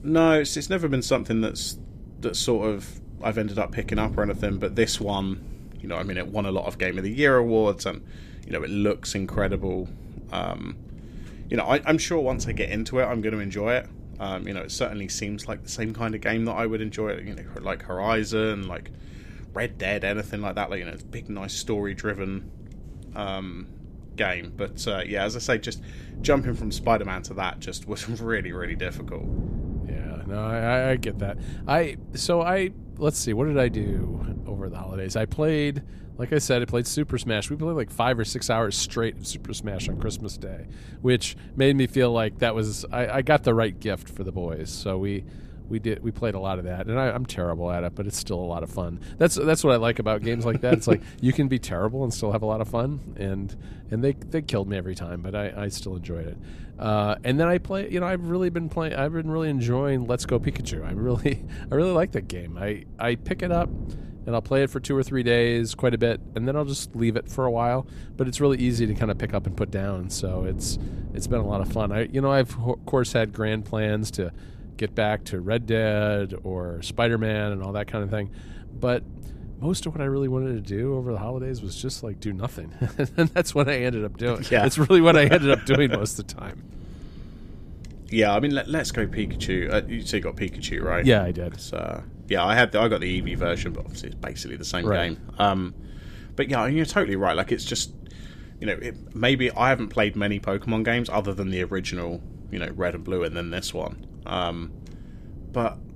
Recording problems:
wind noise on the microphone; occasional gusts; 25 dB below the speech

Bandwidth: 14.5 kHz